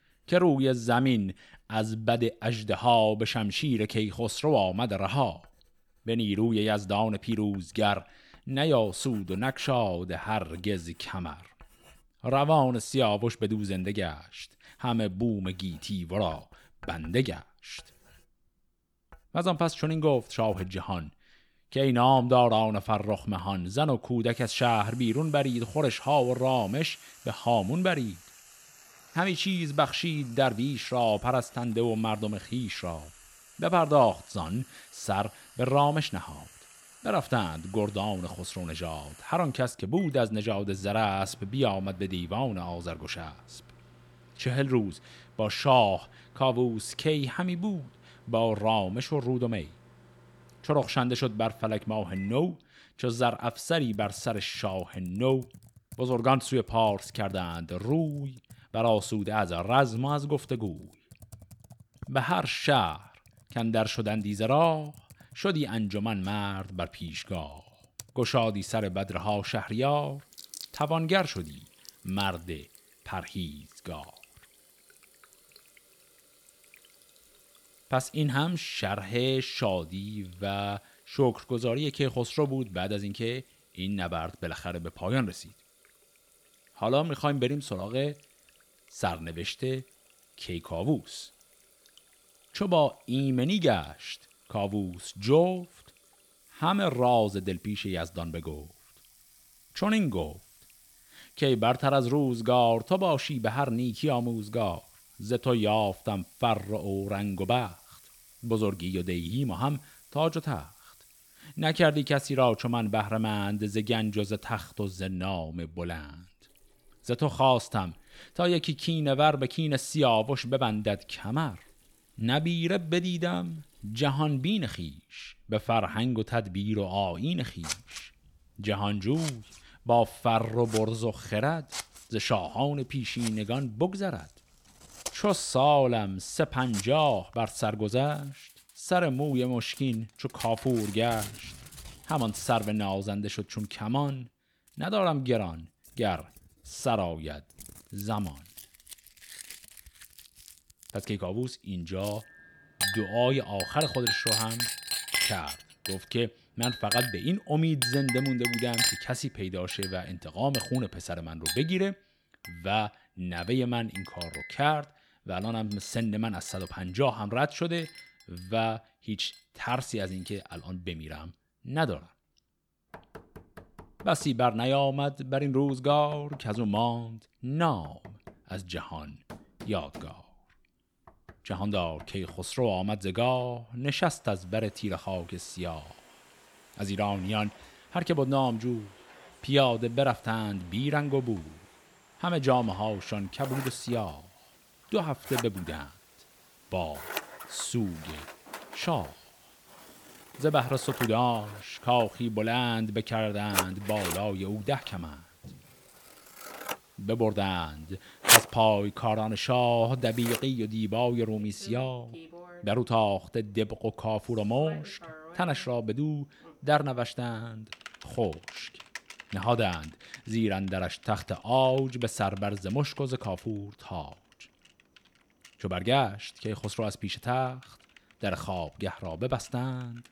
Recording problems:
household noises; loud; throughout; 7 dB below the speech

